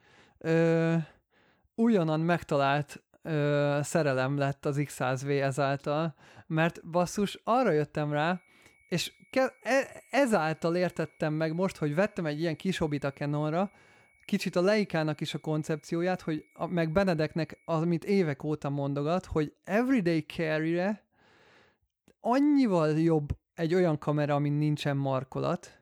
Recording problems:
high-pitched whine; faint; from 8 to 18 s; 2 kHz, 35 dB below the speech

